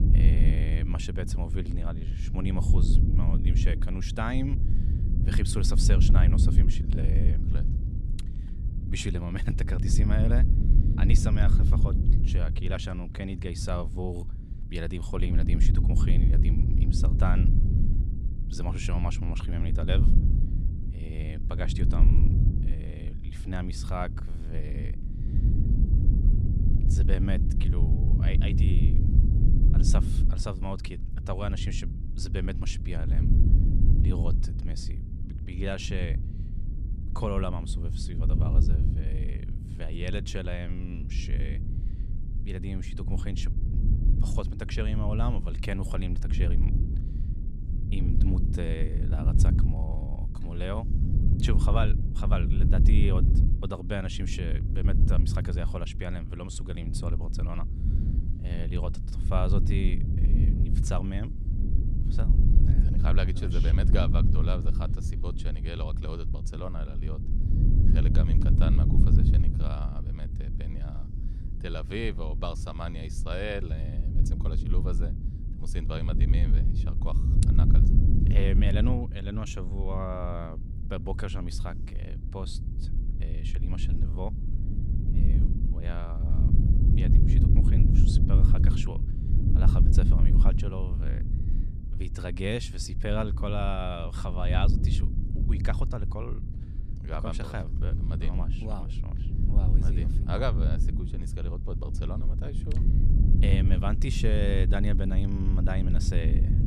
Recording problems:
low rumble; loud; throughout; 4 dB below the speech

